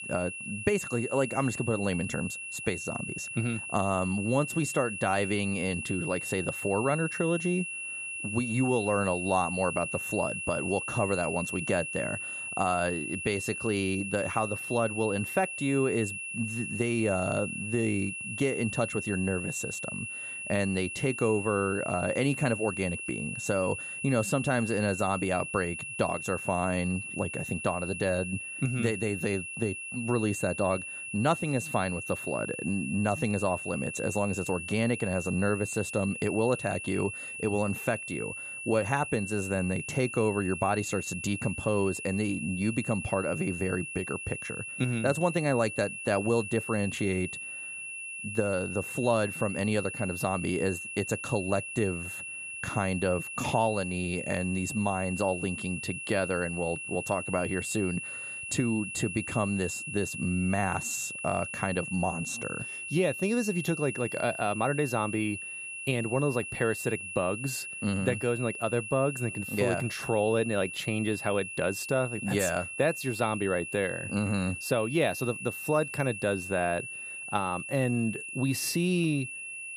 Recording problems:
high-pitched whine; loud; throughout; 2.5 kHz, 6 dB below the speech

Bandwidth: 14.5 kHz